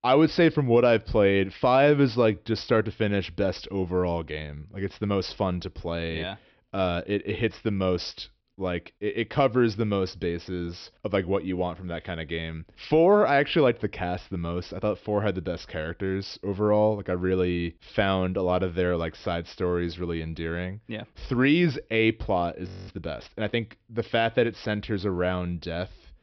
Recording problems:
high frequencies cut off; noticeable; nothing above 5.5 kHz
audio freezing; at 23 s

